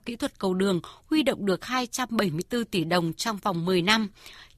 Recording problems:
none

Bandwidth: 14.5 kHz